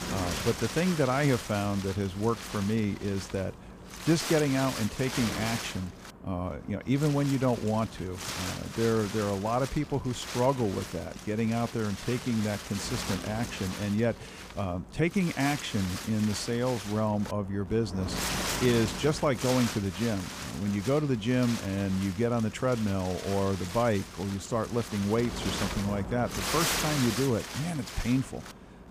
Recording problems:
wind noise on the microphone; heavy; 5 dB below the speech

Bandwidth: 15 kHz